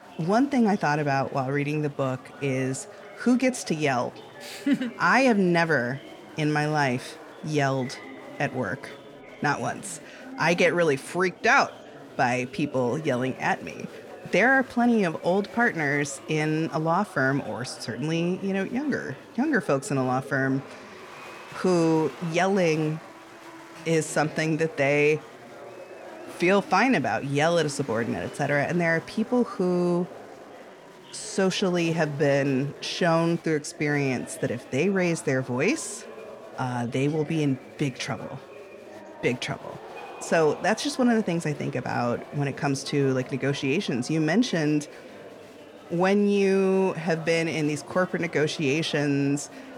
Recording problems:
chatter from many people; noticeable; throughout; 15 dB below the speech

